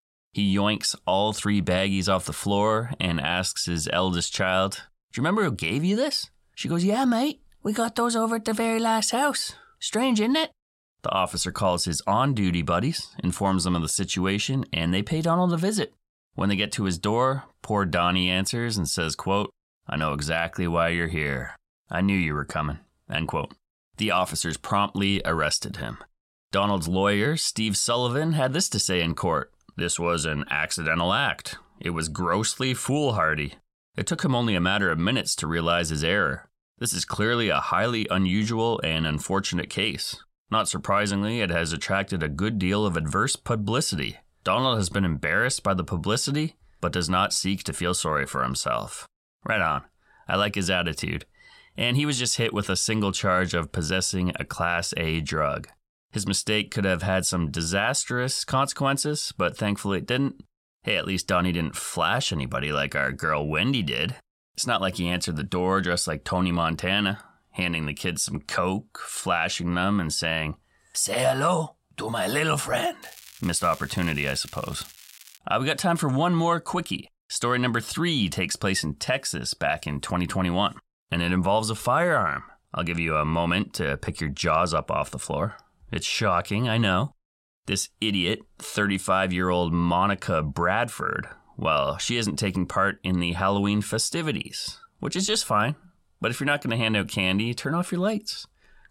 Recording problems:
crackling; noticeable; from 1:13 to 1:15; 20 dB below the speech

